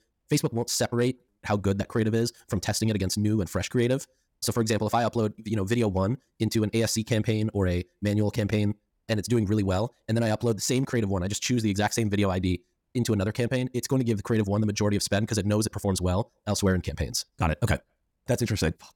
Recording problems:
wrong speed, natural pitch; too fast; 1.7 times normal speed

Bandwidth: 17.5 kHz